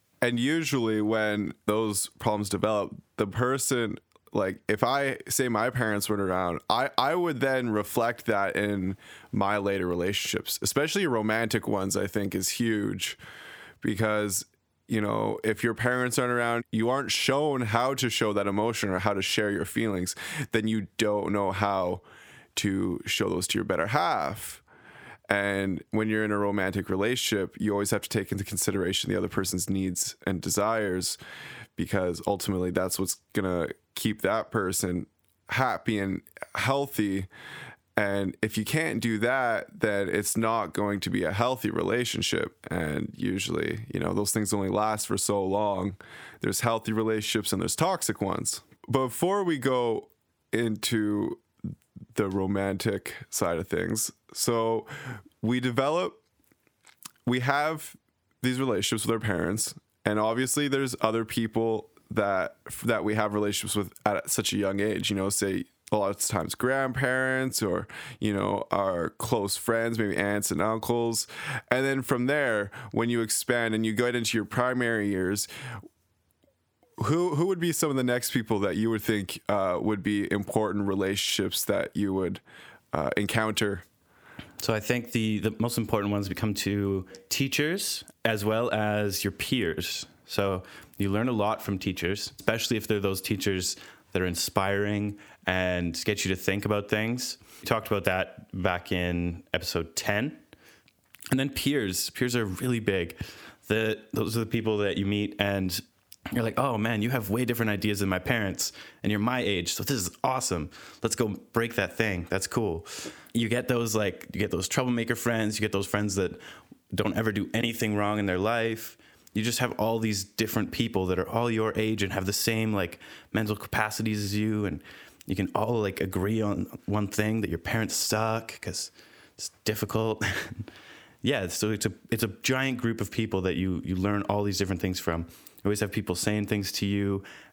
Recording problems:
squashed, flat; heavily

